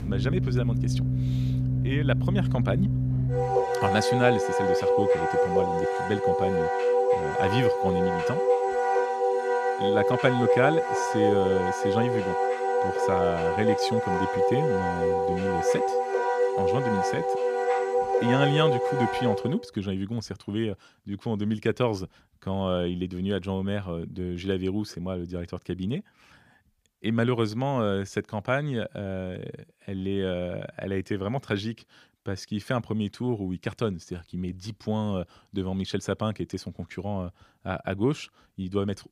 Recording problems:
background music; very loud; until 19 s; 4 dB above the speech

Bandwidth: 15 kHz